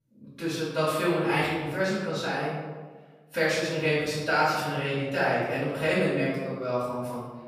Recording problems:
room echo; strong; dies away in 1.2 s
off-mic speech; far

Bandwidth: 14.5 kHz